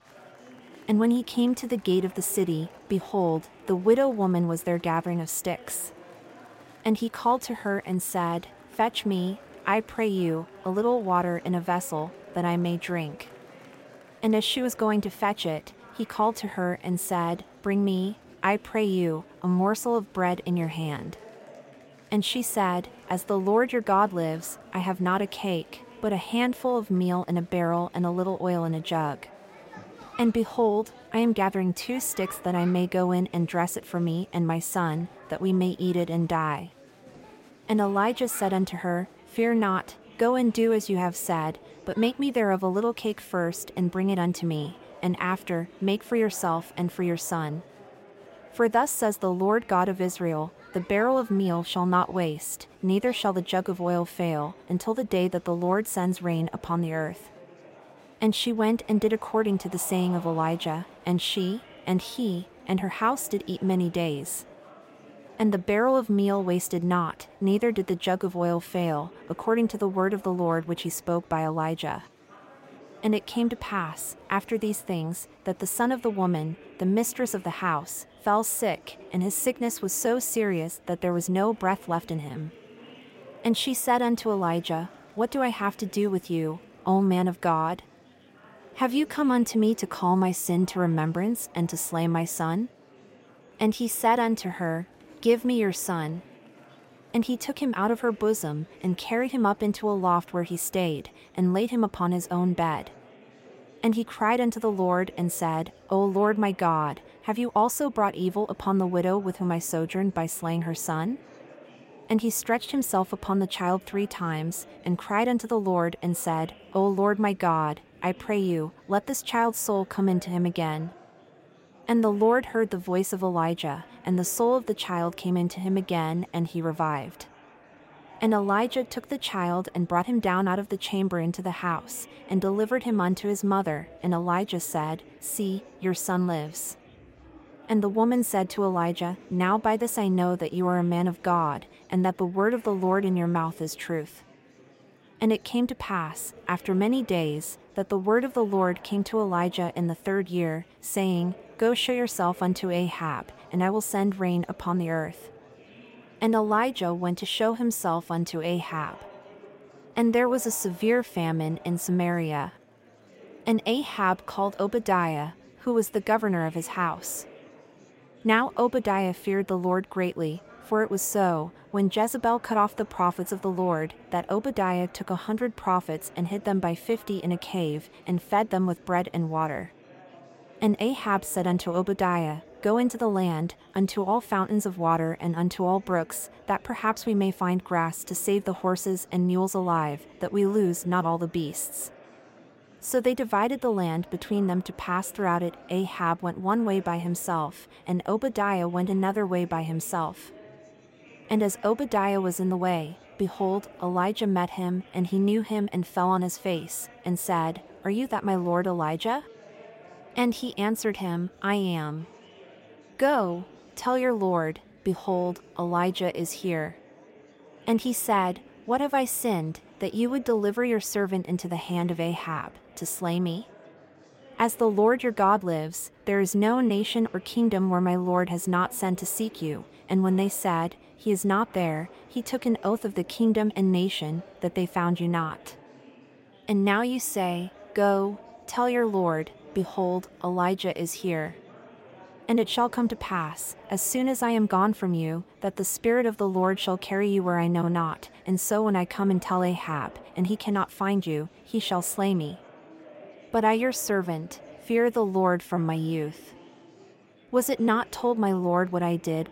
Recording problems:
murmuring crowd; faint; throughout; 25 dB below the speech

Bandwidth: 16 kHz